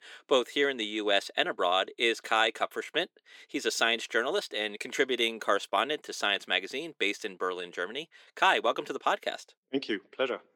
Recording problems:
thin; somewhat; fading below 300 Hz

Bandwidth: 17.5 kHz